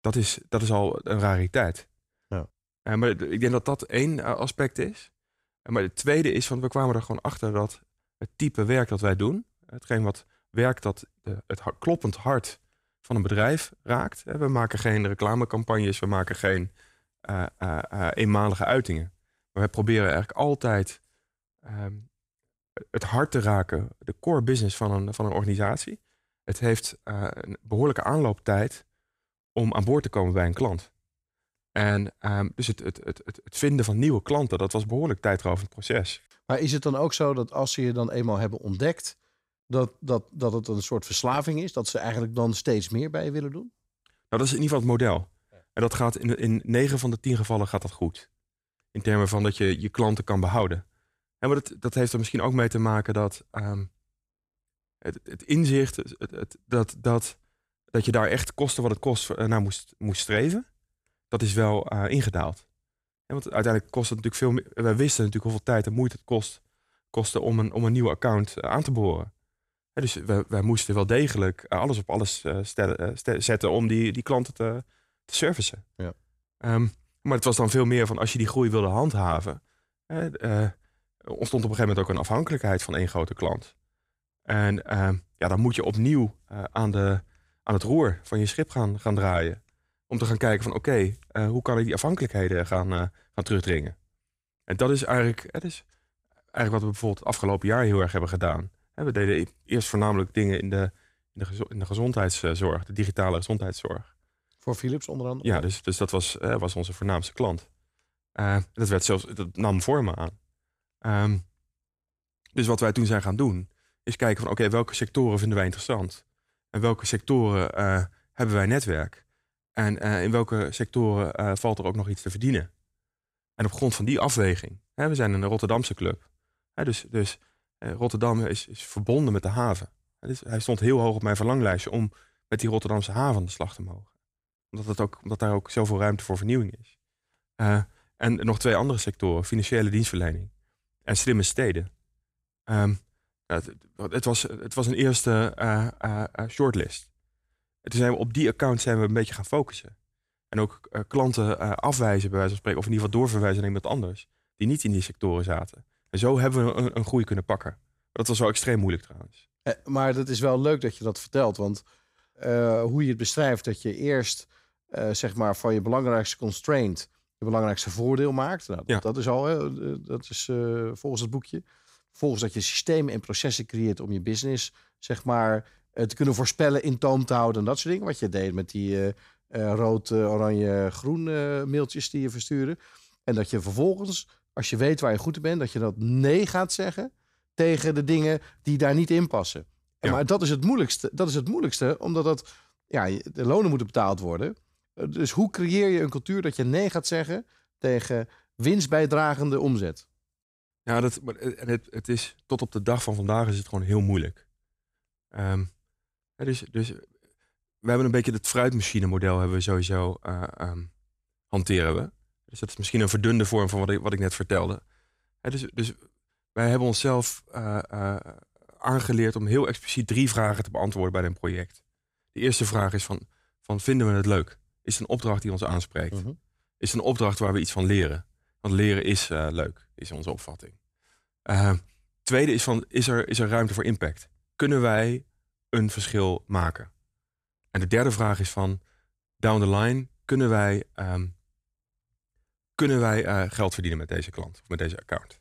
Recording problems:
none

